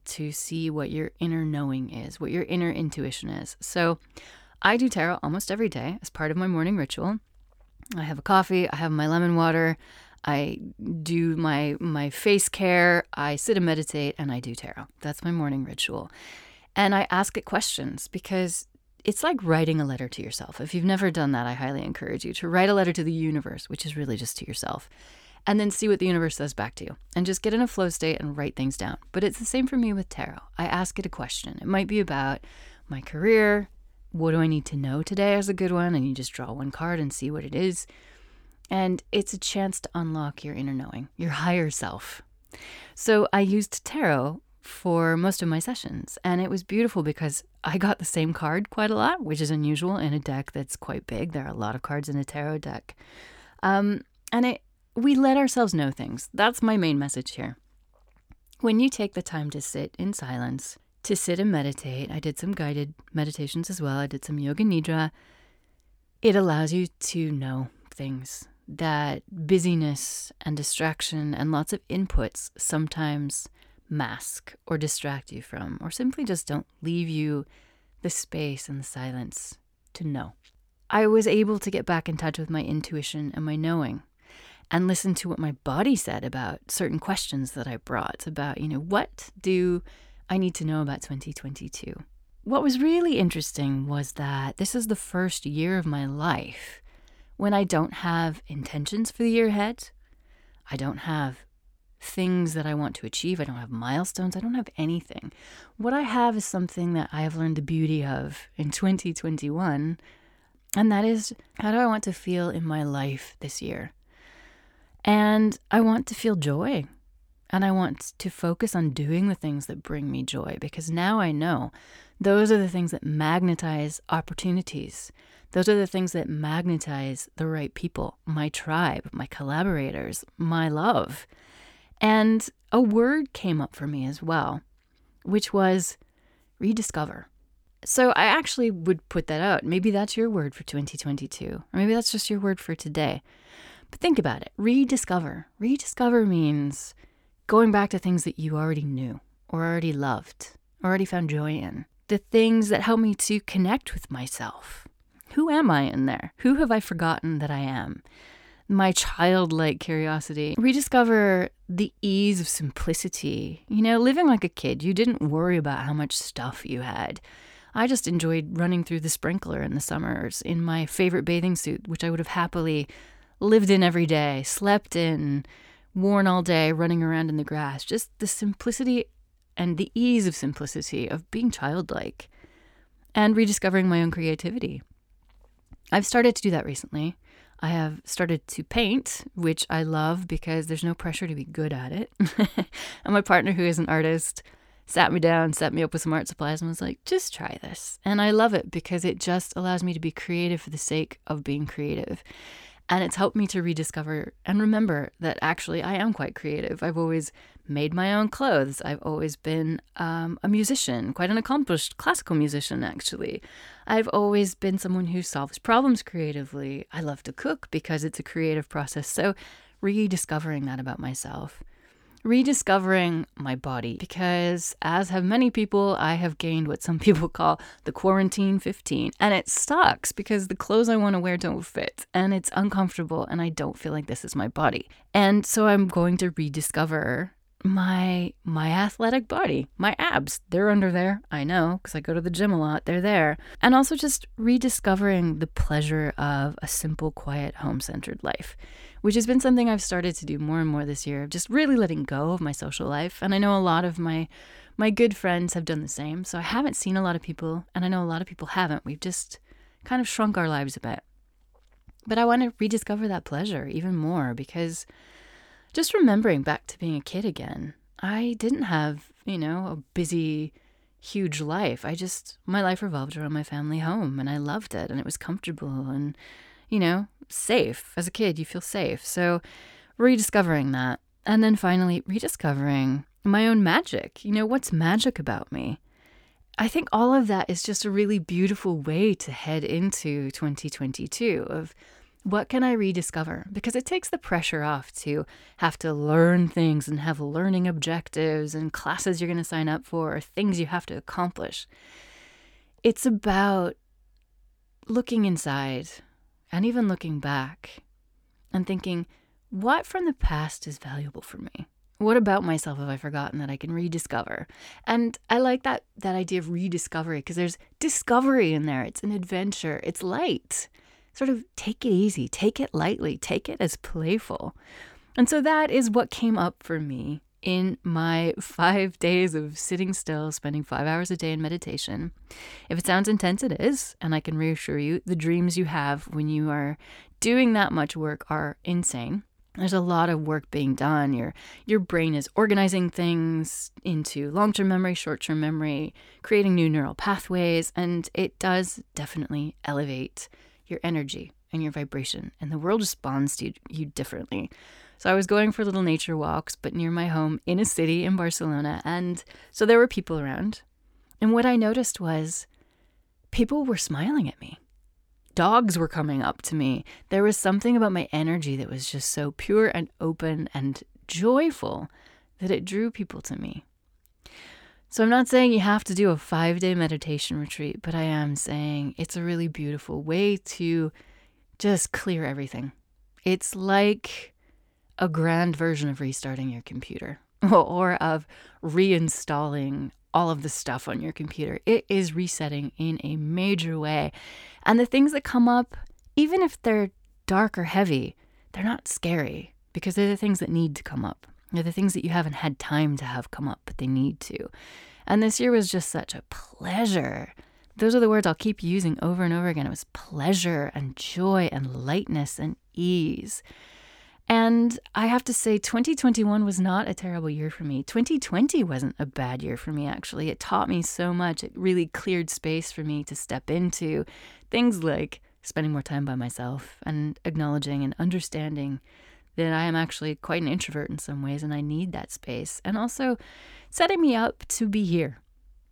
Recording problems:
none

